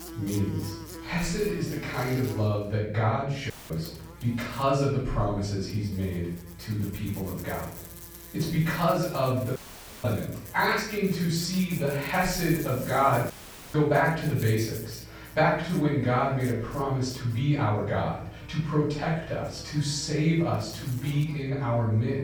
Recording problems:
off-mic speech; far
room echo; noticeable; dies away in 0.7 s
electrical hum; noticeable; throughout; 60 Hz, 20 dB below the speech
audio cutting out; filled with static; at 3.5 s, at 9.5 s and at 13 s

